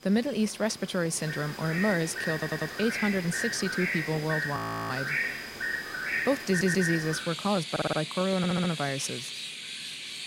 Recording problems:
animal sounds; loud; throughout; 3 dB below the speech
audio stuttering; 4 times, first at 2.5 s
audio freezing; at 4.5 s

